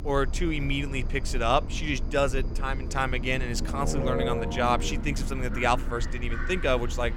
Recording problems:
animal sounds; noticeable; throughout; 15 dB below the speech
low rumble; noticeable; throughout; 10 dB below the speech

